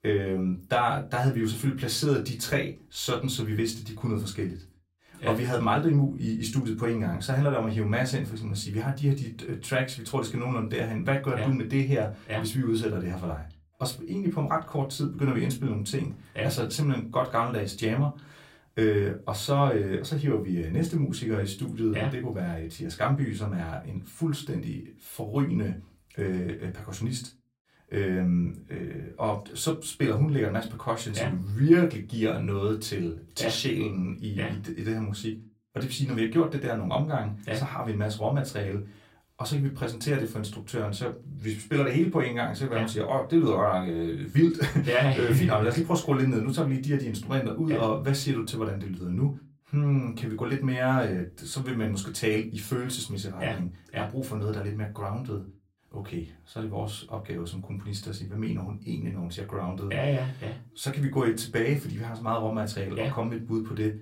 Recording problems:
off-mic speech; far
room echo; very slight; dies away in 0.2 s

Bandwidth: 16 kHz